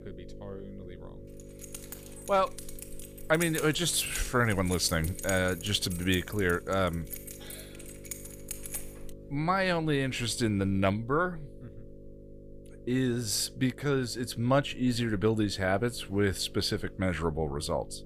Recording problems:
electrical hum; faint; throughout; 50 Hz, 25 dB below the speech
jangling keys; noticeable; from 1.5 to 9 s; peak 7 dB below the speech

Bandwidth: 15 kHz